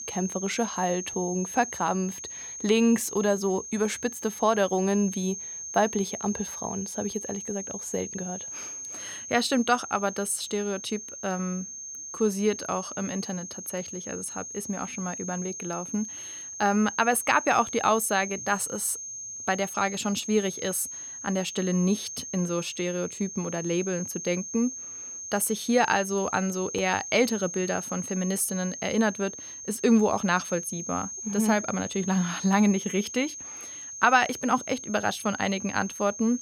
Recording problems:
high-pitched whine; loud; throughout; 6.5 kHz, 8 dB below the speech

